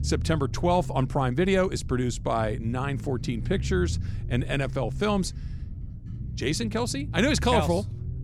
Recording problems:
low rumble; noticeable; throughout; 20 dB below the speech

